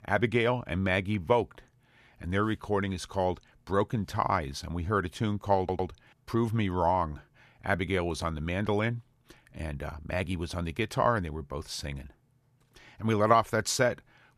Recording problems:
audio stuttering; at 5.5 s

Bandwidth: 14 kHz